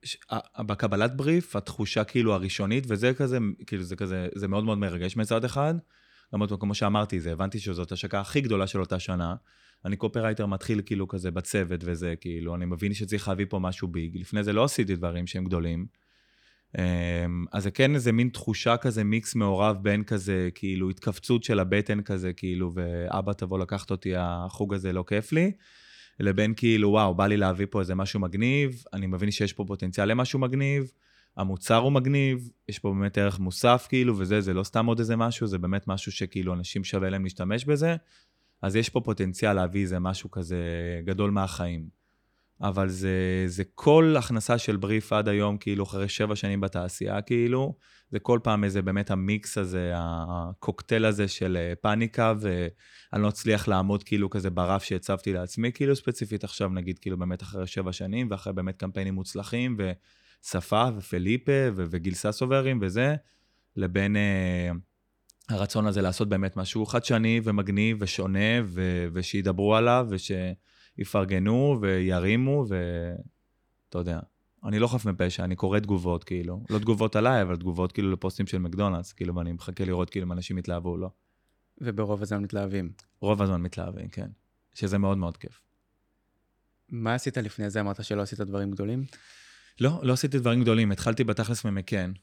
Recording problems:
none

